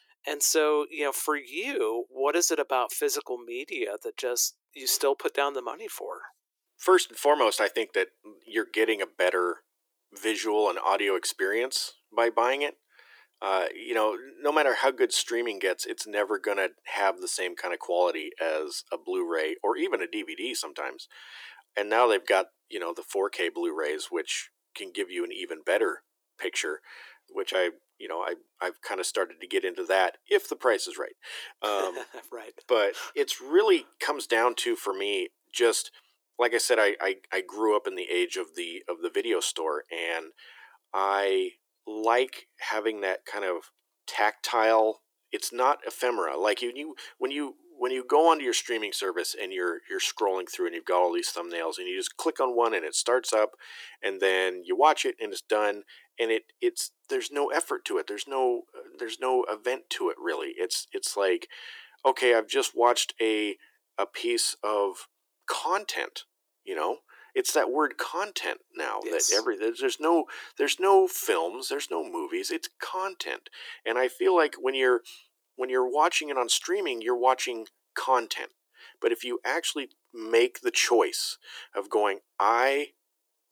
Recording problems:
thin; very; fading below 350 Hz

